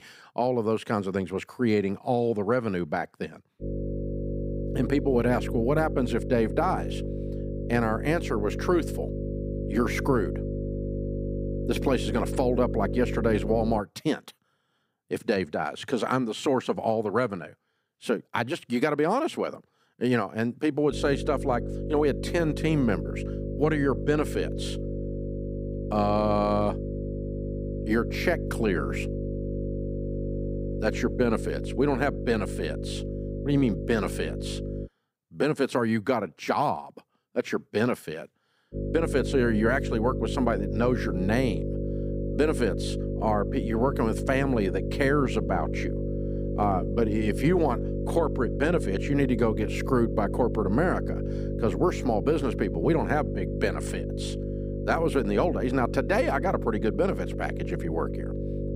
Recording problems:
electrical hum; loud; from 3.5 to 14 s, from 21 to 35 s and from 39 s on; 50 Hz, 9 dB below the speech

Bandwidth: 15.5 kHz